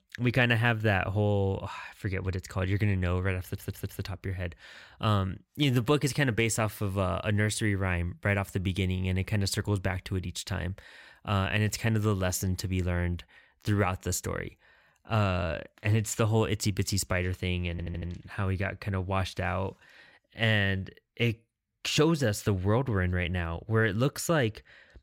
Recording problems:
audio stuttering; at 3.5 s and at 18 s

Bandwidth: 16 kHz